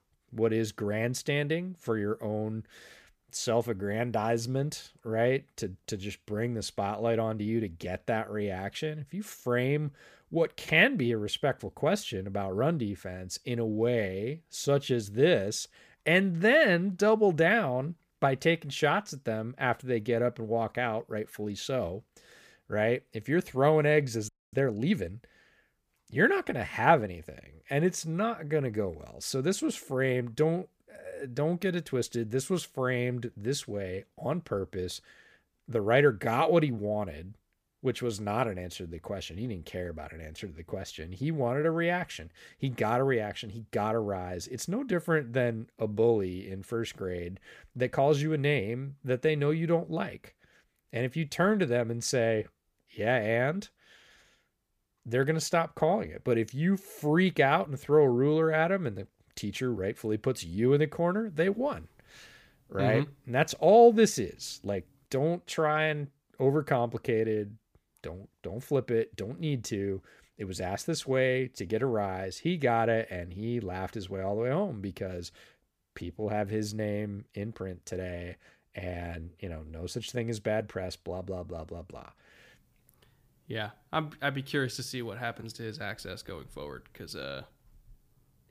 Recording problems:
audio freezing; at 24 s

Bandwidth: 15 kHz